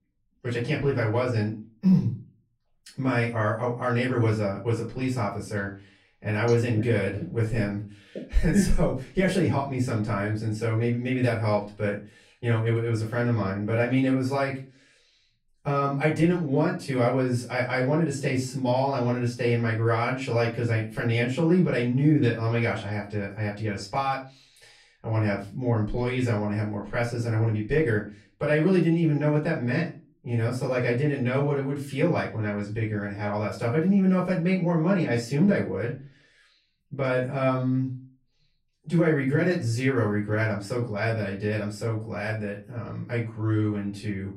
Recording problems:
off-mic speech; far
room echo; slight; dies away in 0.3 s

